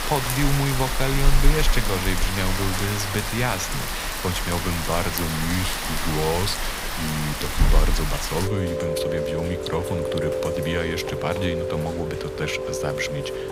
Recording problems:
rain or running water; very loud; throughout; 1 dB above the speech

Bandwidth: 15.5 kHz